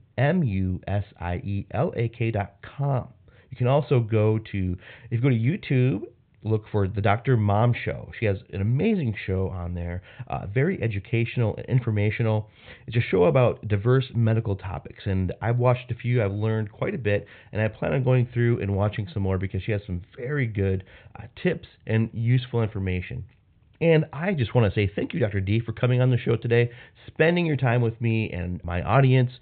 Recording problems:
high frequencies cut off; severe; nothing above 4 kHz

